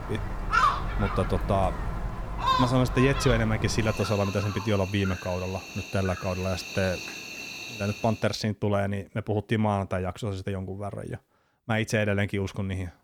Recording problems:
animal sounds; loud; until 8 s; 3 dB below the speech

